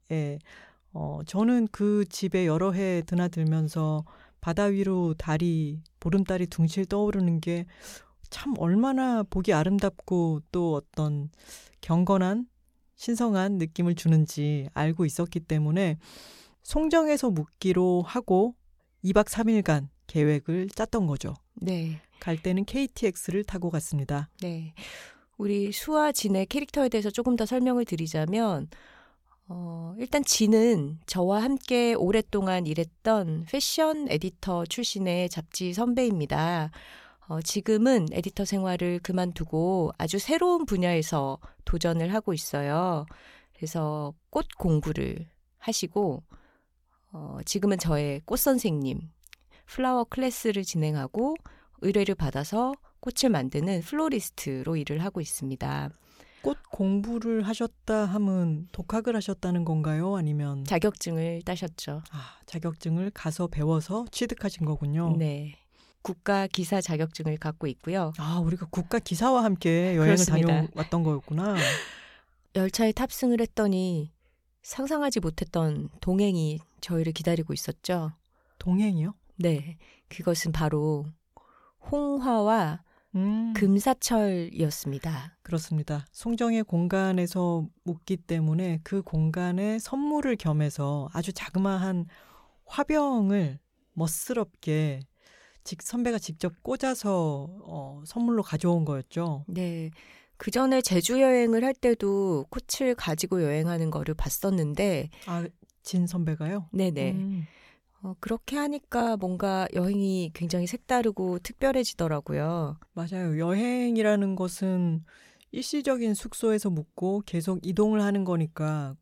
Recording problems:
none

